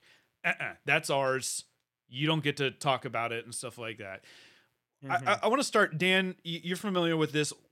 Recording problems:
none

